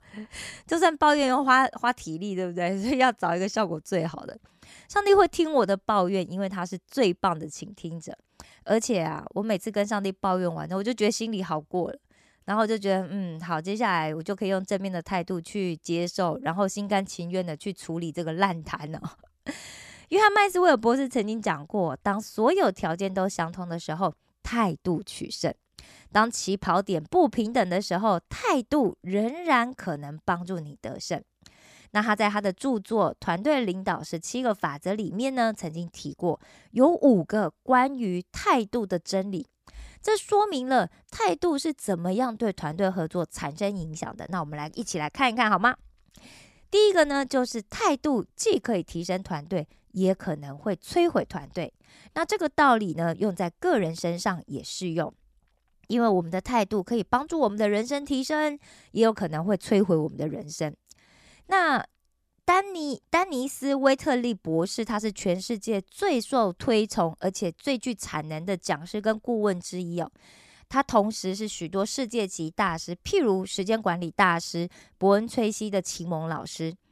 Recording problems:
none

